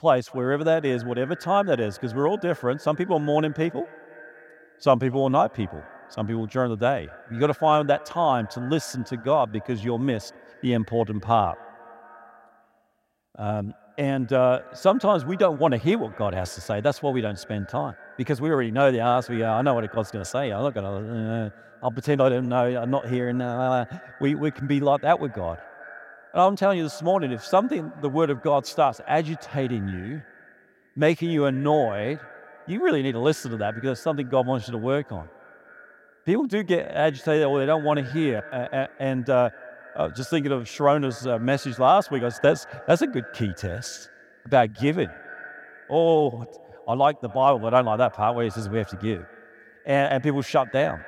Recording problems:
echo of what is said; faint; throughout; 230 ms later, 20 dB below the speech

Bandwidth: 16 kHz